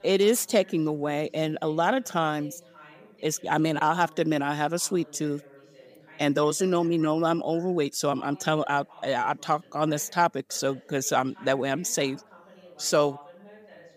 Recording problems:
background chatter; faint; throughout; 2 voices, 25 dB below the speech

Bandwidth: 15 kHz